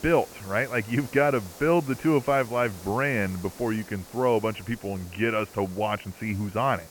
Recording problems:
high frequencies cut off; severe; nothing above 3 kHz
hiss; noticeable; throughout; 20 dB below the speech

